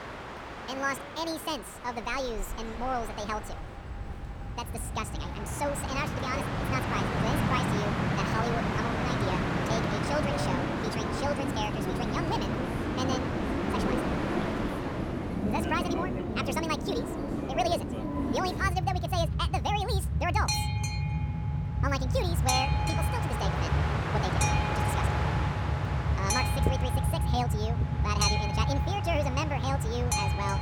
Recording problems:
wrong speed and pitch; too fast and too high; 1.6 times normal speed
train or aircraft noise; very loud; throughout; 4 dB above the speech
machinery noise; very faint; throughout; 30 dB below the speech

